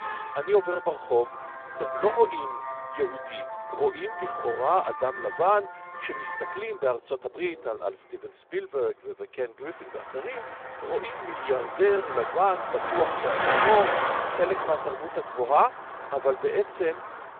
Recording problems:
phone-call audio; poor line
traffic noise; loud; throughout; 4 dB below the speech

